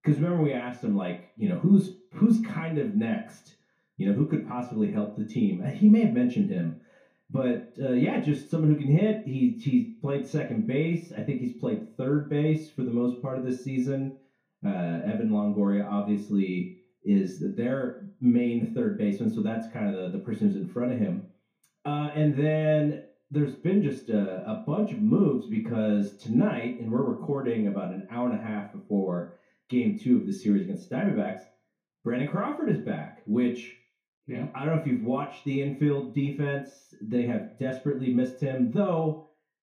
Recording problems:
off-mic speech; far
room echo; slight; dies away in 0.4 s

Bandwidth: 15 kHz